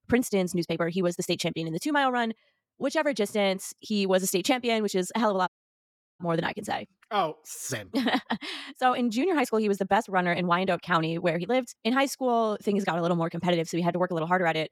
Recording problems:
wrong speed, natural pitch; too fast; 1.5 times normal speed
audio cutting out; at 5.5 s for 0.5 s

